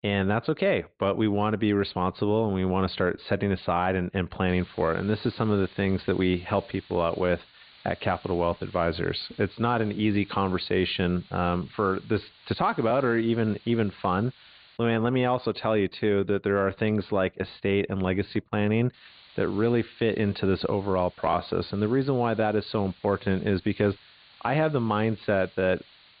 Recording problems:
high frequencies cut off; severe; nothing above 4.5 kHz
hiss; faint; from 4.5 to 15 s and from 19 s on; 25 dB below the speech

